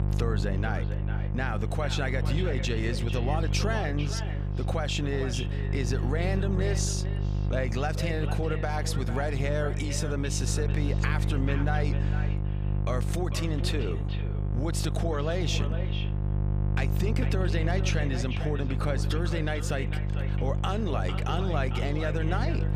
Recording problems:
echo of what is said; strong; throughout; 450 ms later, 10 dB below the speech
electrical hum; loud; throughout; 50 Hz, 8 dB below the speech

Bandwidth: 15 kHz